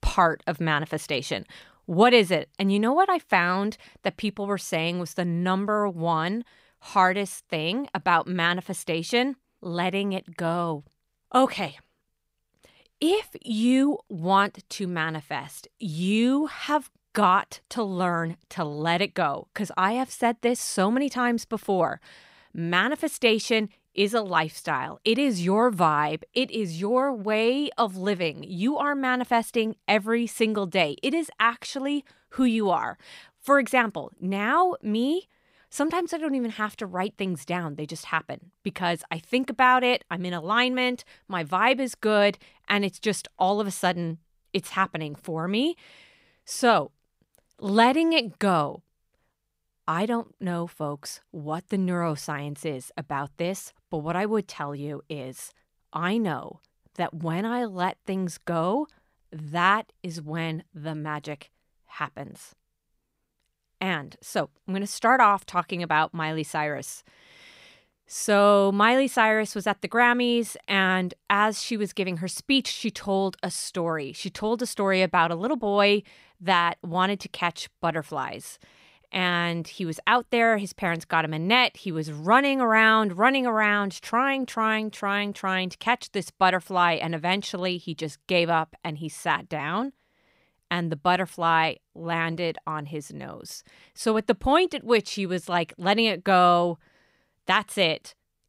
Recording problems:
none

